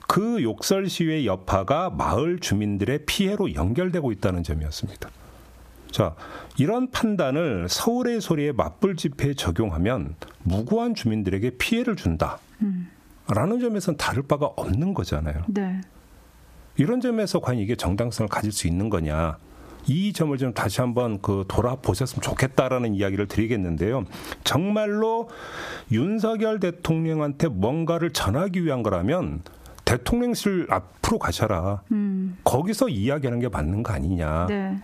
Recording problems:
squashed, flat; heavily

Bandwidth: 14.5 kHz